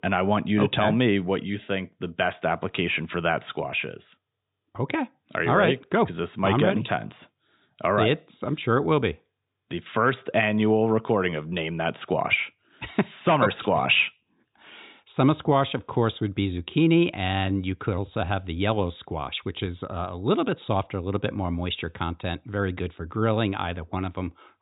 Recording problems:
high frequencies cut off; severe; nothing above 4 kHz

